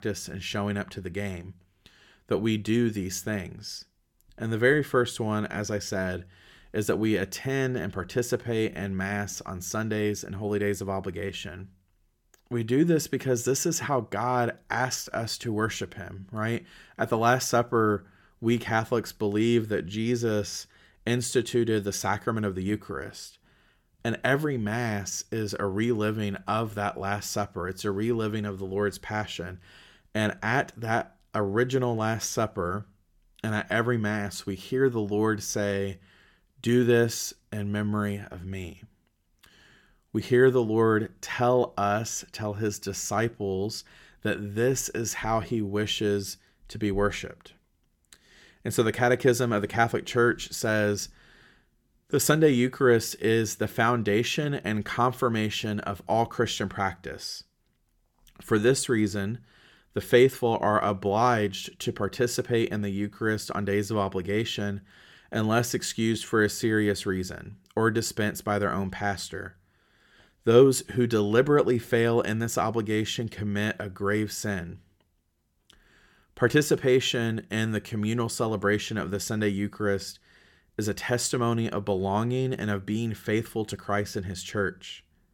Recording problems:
none

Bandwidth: 17 kHz